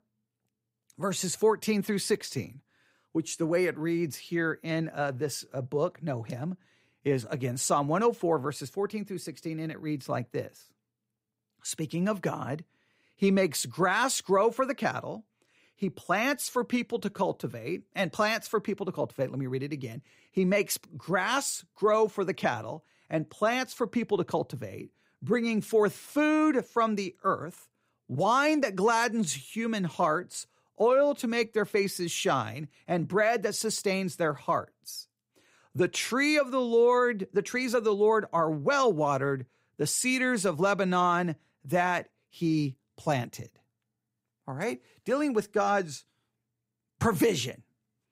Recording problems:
none

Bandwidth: 15.5 kHz